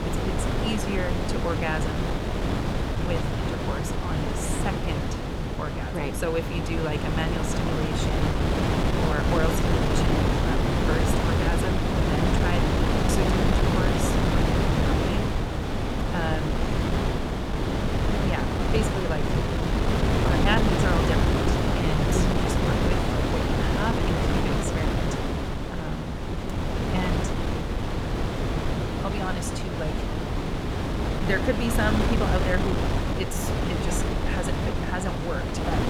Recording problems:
wind noise on the microphone; heavy; 3 dB above the speech

